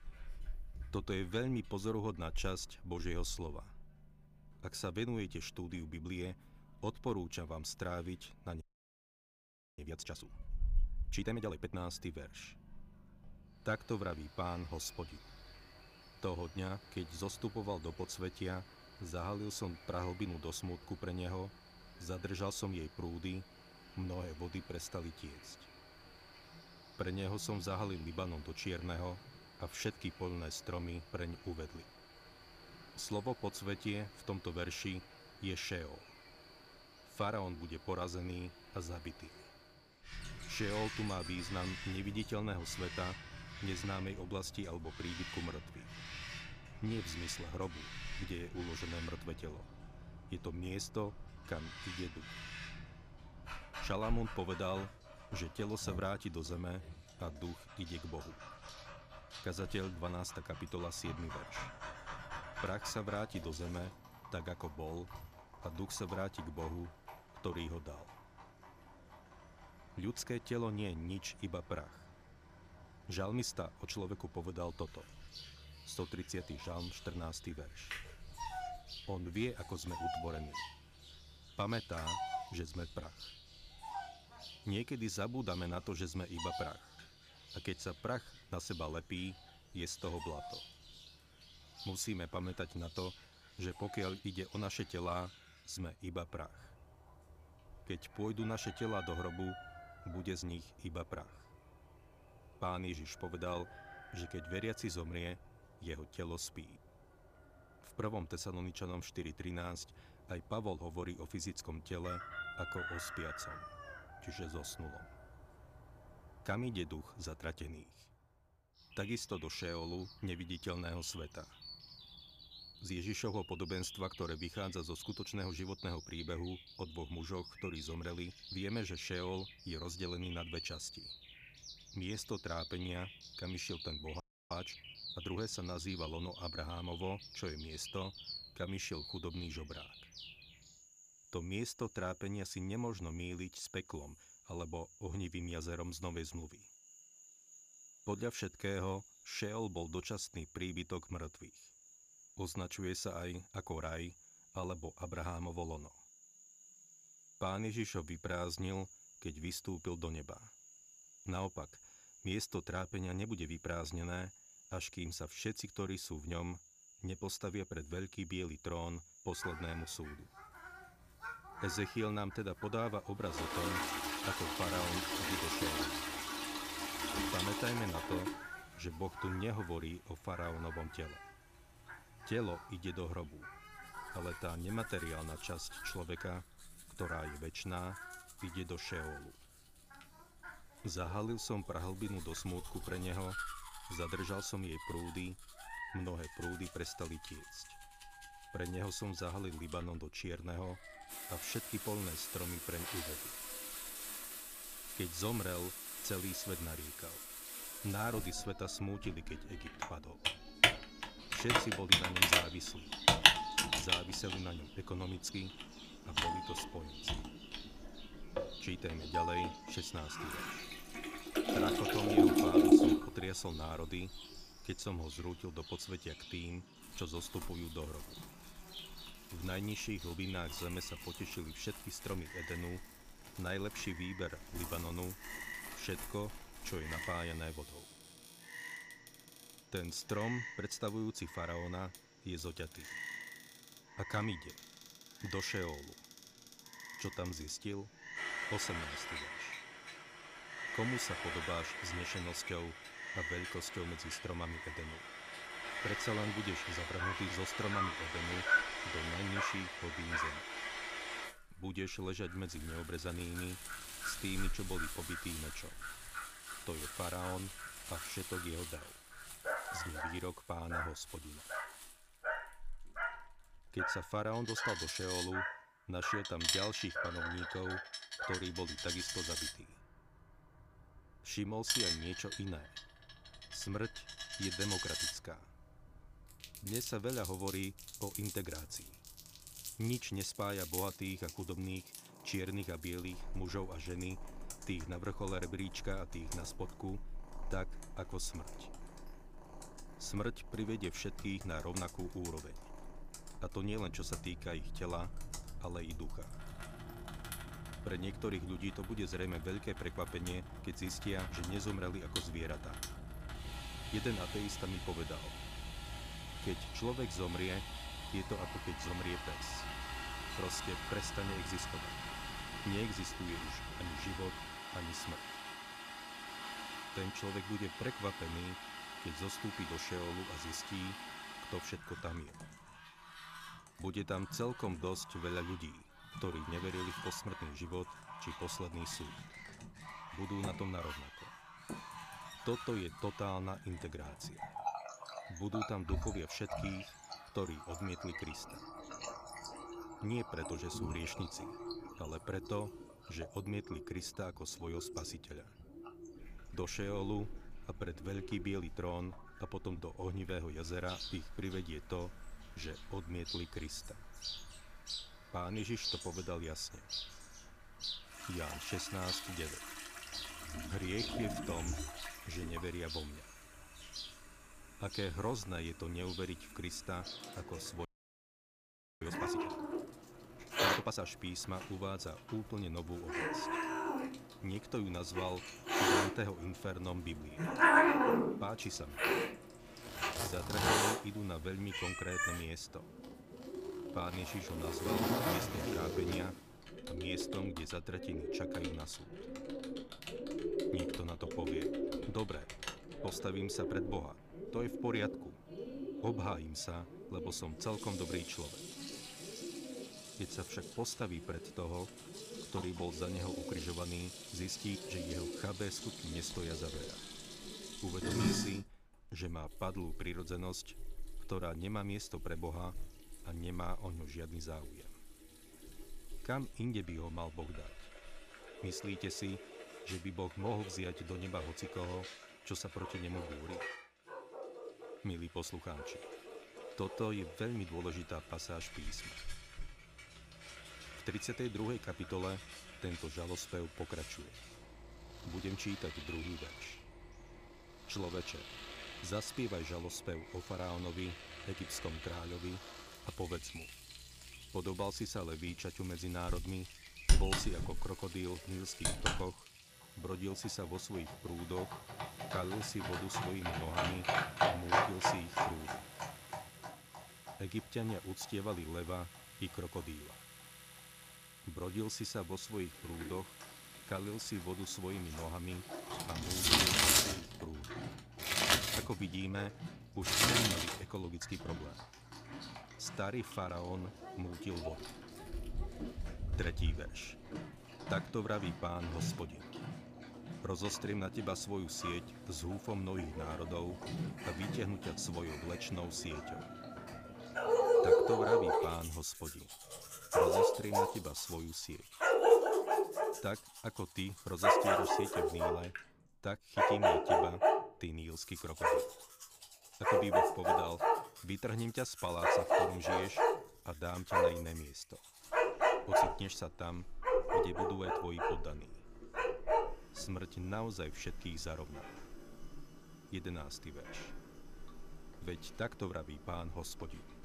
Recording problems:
animal sounds; very loud; throughout; 1 dB above the speech
household noises; very loud; from 2:53 on; 2 dB above the speech
audio freezing; at 8.5 s for 1 s, at 2:14 and at 6:18 for 1 s

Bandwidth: 15 kHz